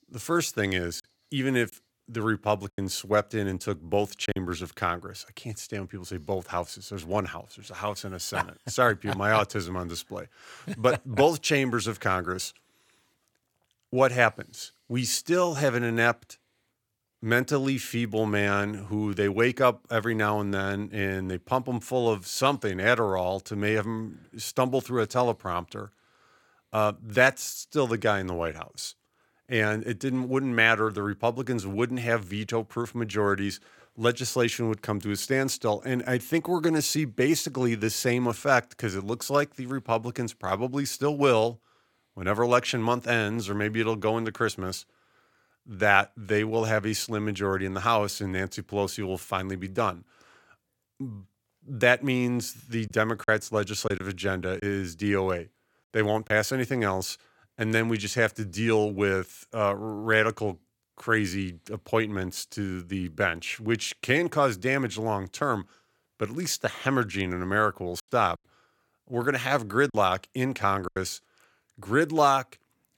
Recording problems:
choppy; very; from 1 to 4.5 s, from 53 to 56 s and from 1:08 to 1:11; 5% of the speech affected

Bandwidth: 17 kHz